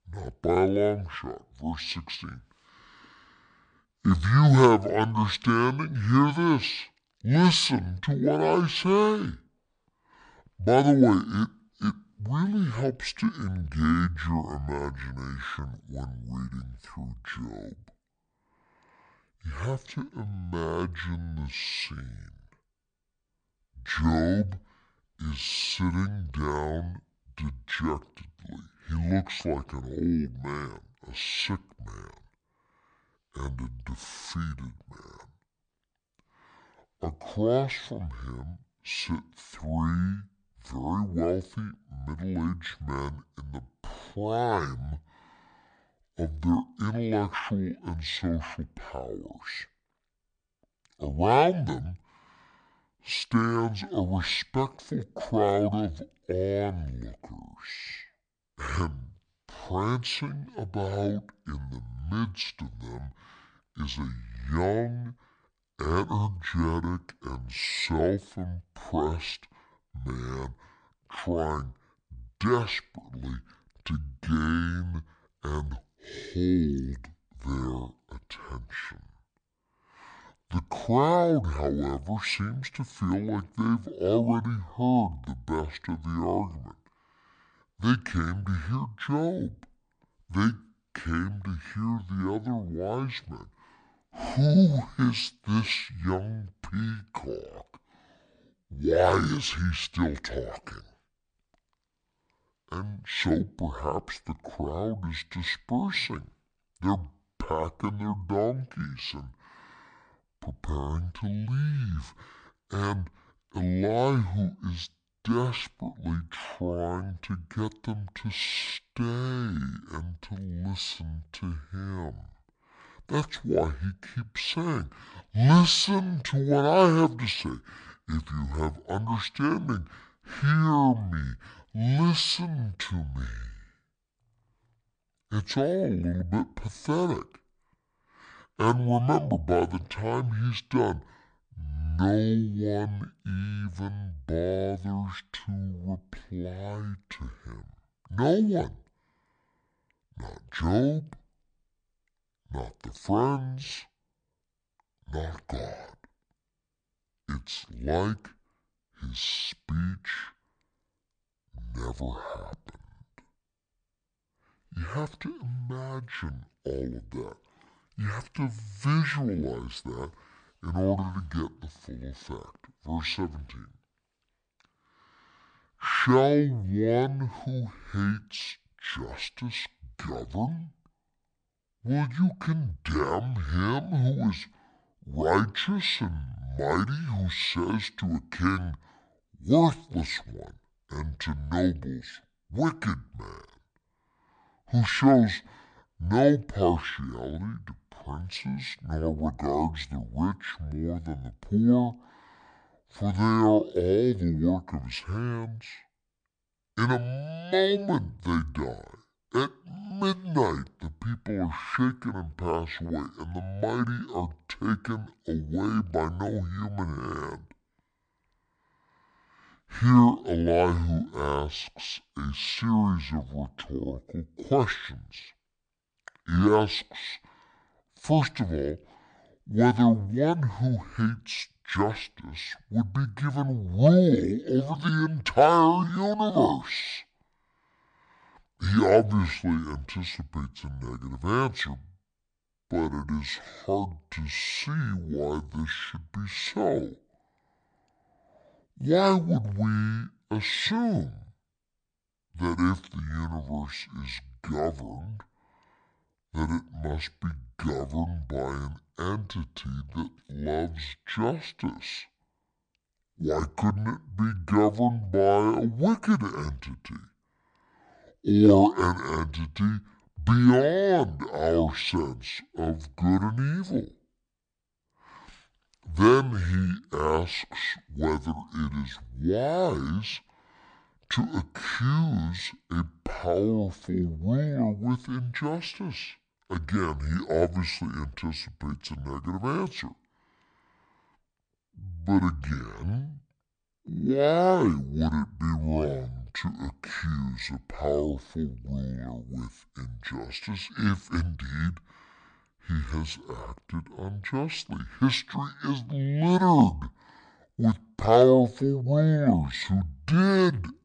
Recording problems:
wrong speed and pitch; too slow and too low; 0.6 times normal speed

